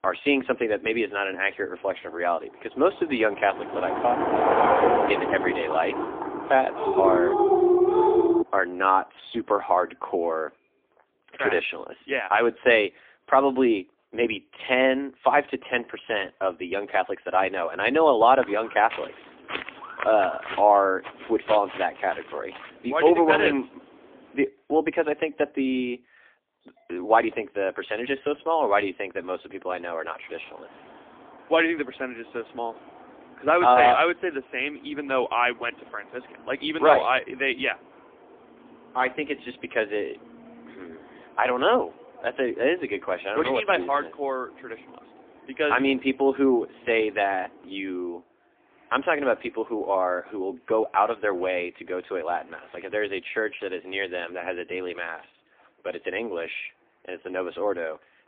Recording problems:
phone-call audio; poor line; nothing above 3.5 kHz
traffic noise; loud; throughout; 2 dB below the speech
dog barking; loud; from 7 to 8.5 s; peak 5 dB above the speech
footsteps; noticeable; from 18 to 23 s; peak 9 dB below the speech

